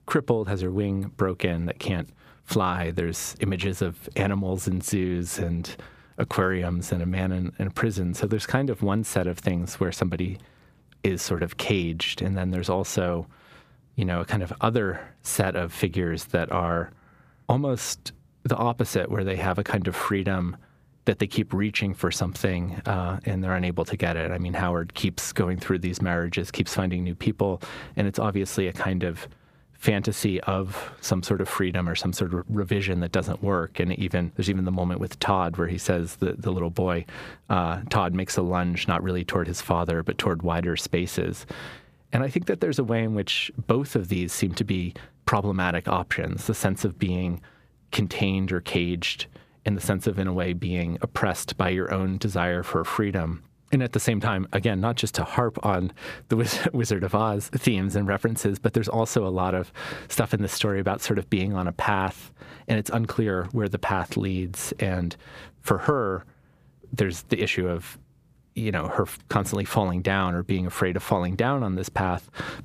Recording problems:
squashed, flat; somewhat

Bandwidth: 15 kHz